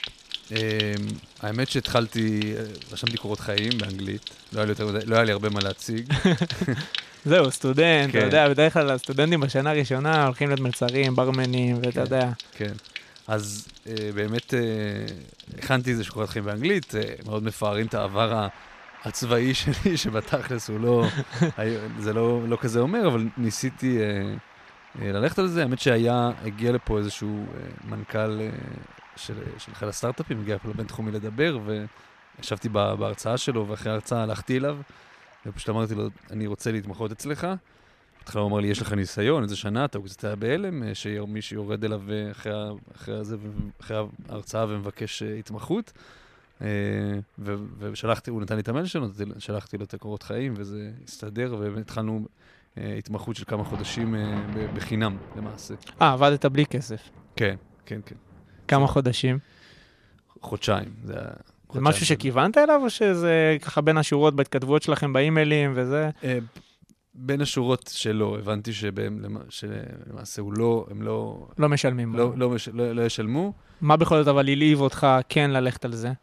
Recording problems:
rain or running water; noticeable; throughout; 15 dB below the speech

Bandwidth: 14 kHz